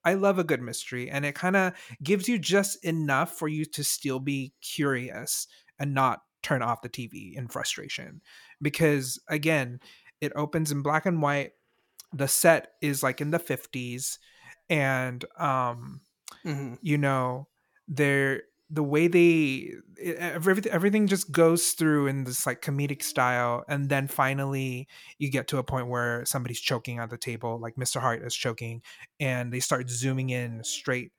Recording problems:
none

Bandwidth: 17.5 kHz